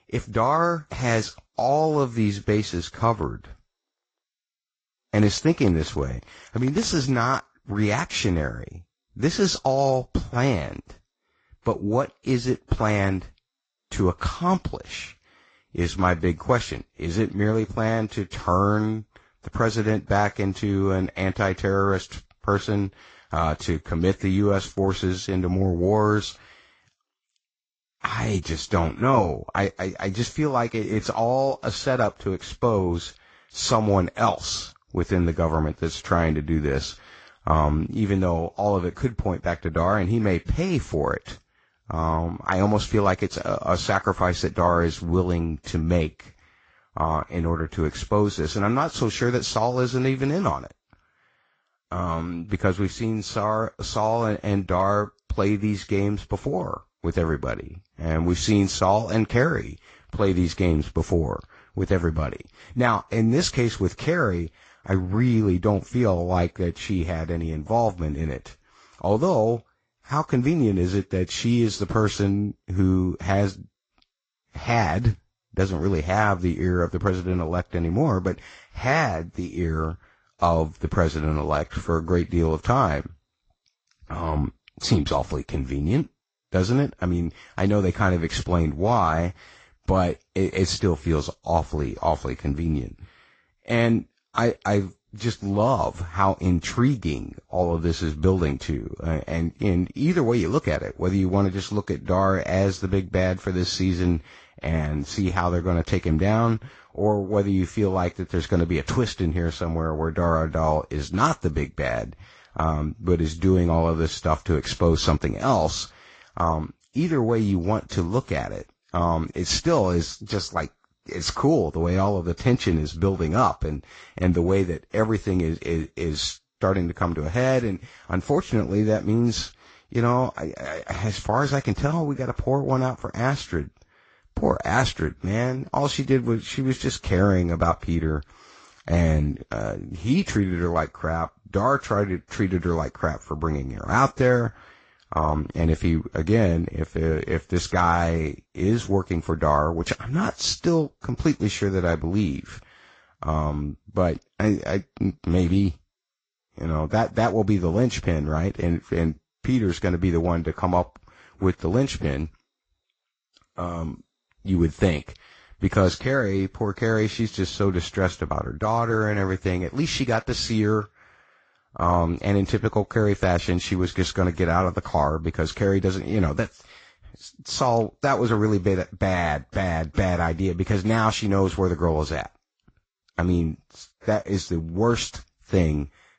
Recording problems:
high frequencies cut off; noticeable; nothing above 7.5 kHz
garbled, watery; slightly

